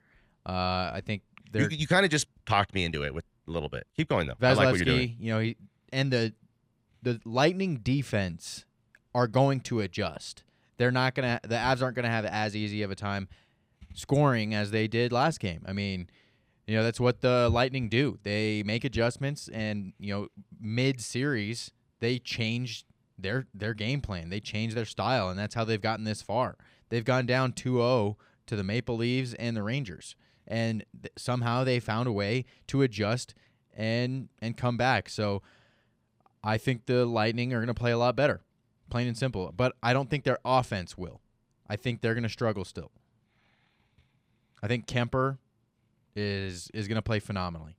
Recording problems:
none

